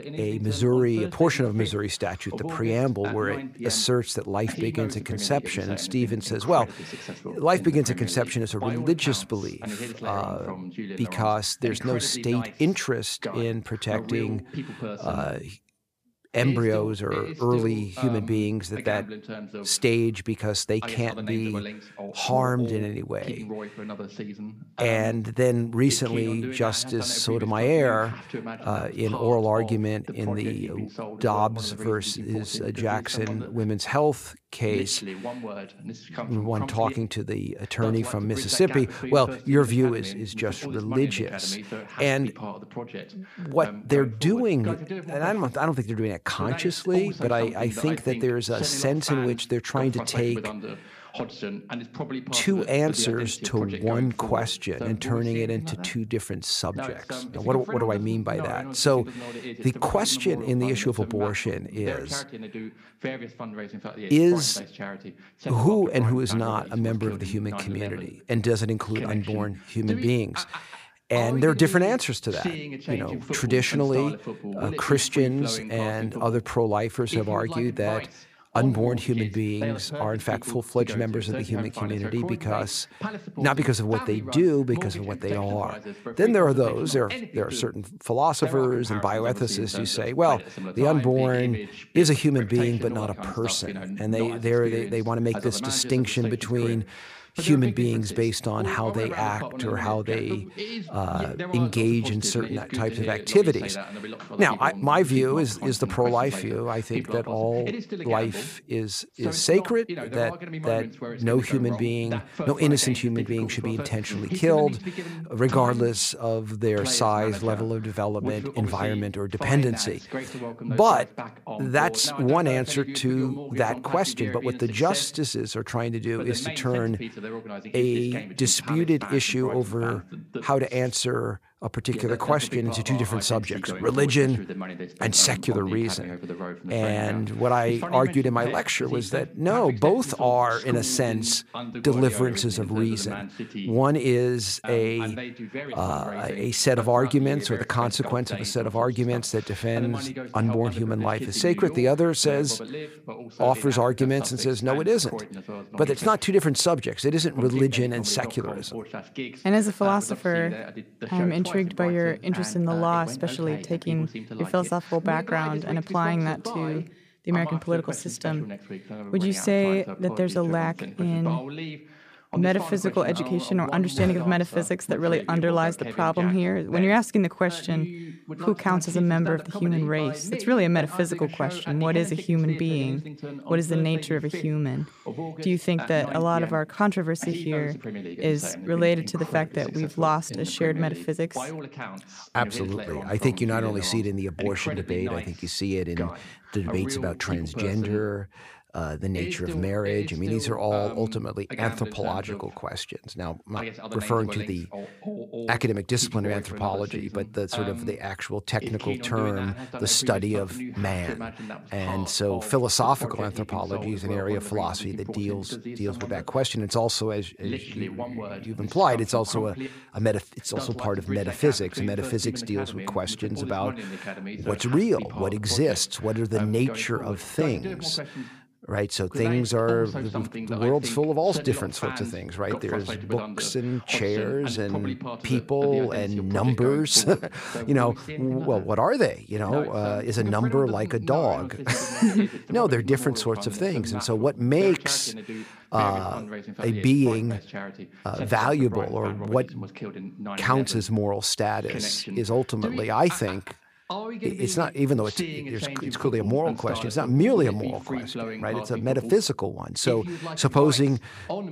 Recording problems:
voice in the background; noticeable; throughout; 10 dB below the speech

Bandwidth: 15 kHz